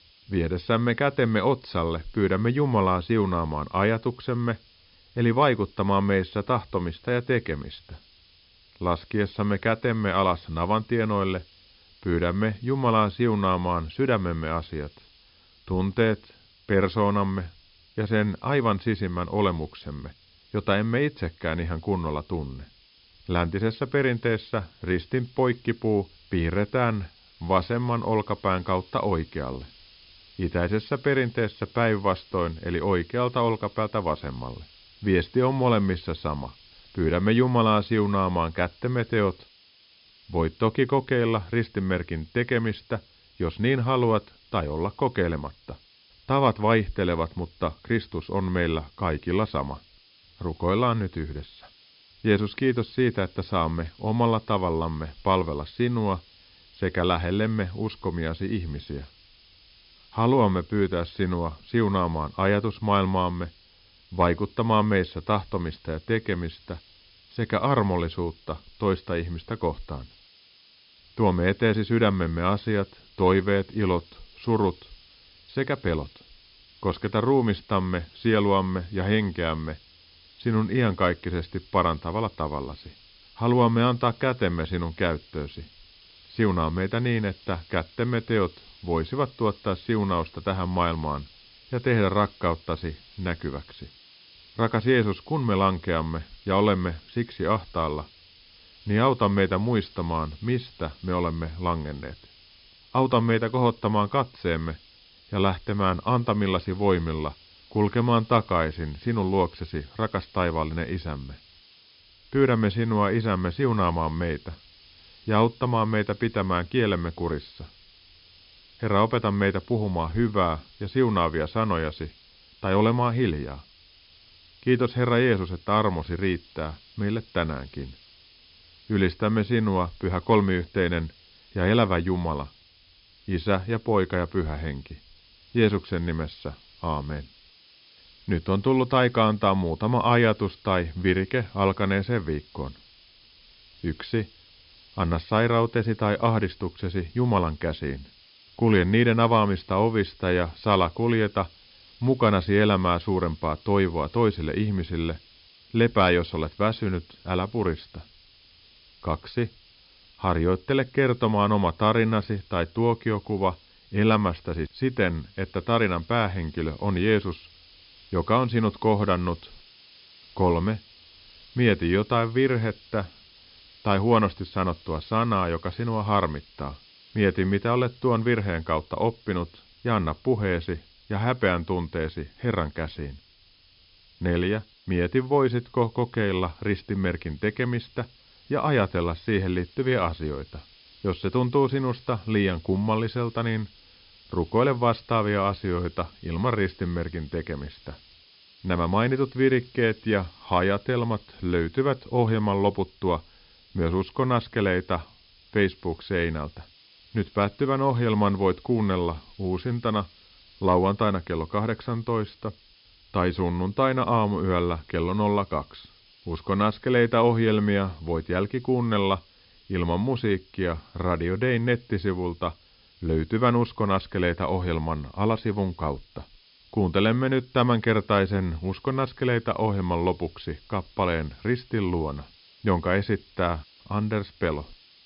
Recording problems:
high frequencies cut off; noticeable; nothing above 5.5 kHz
hiss; faint; throughout; 25 dB below the speech

